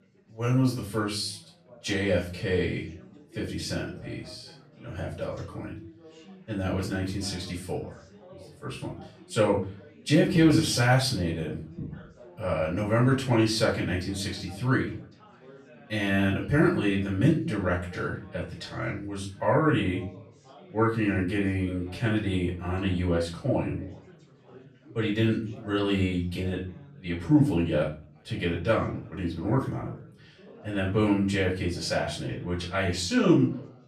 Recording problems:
off-mic speech; far
room echo; slight; dies away in 0.4 s
chatter from many people; faint; throughout; 25 dB below the speech

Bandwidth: 14 kHz